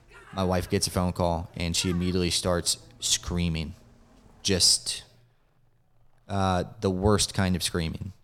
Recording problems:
animal sounds; faint; throughout; 25 dB below the speech

